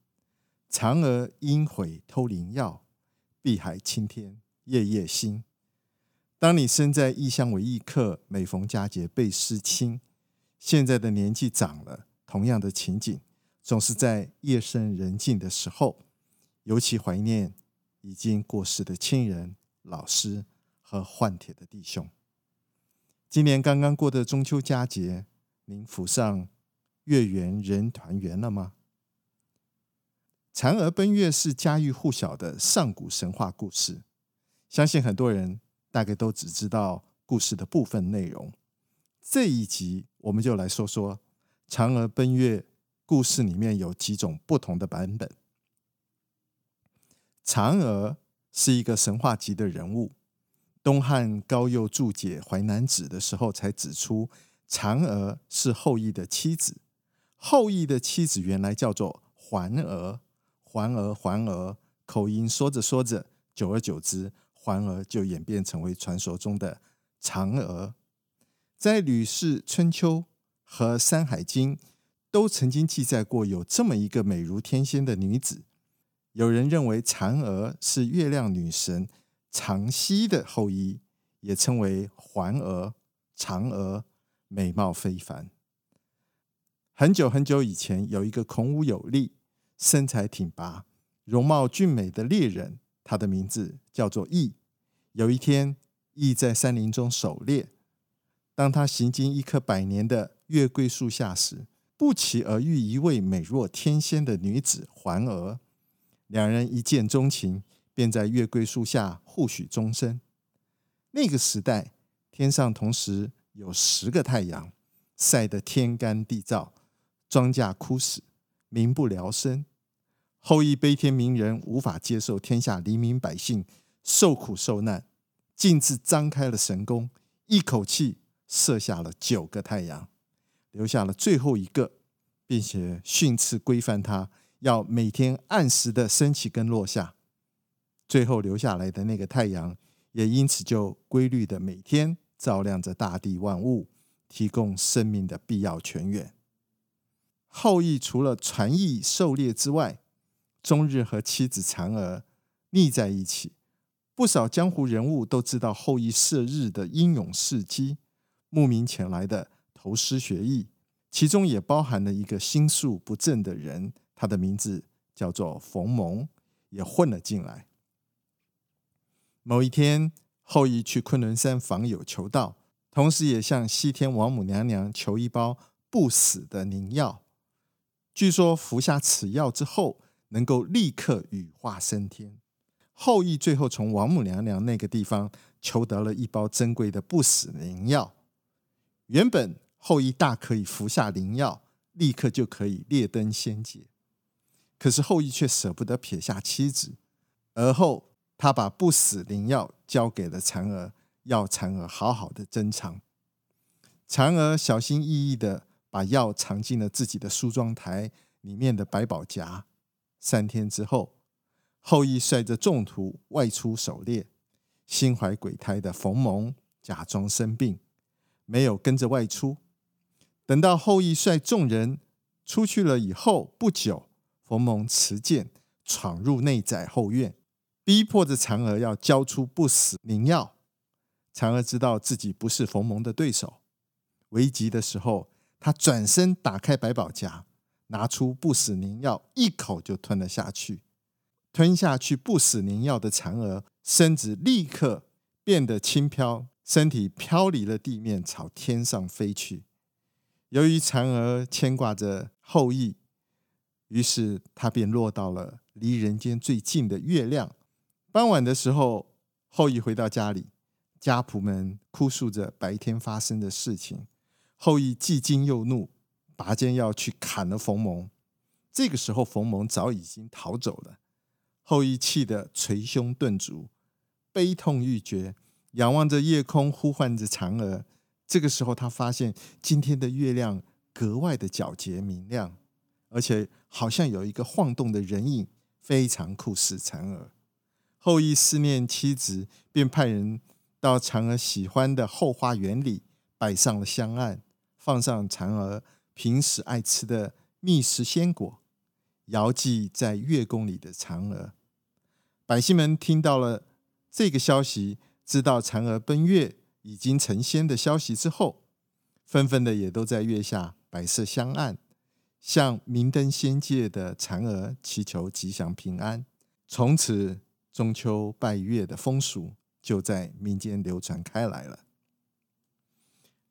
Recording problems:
none

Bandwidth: 18 kHz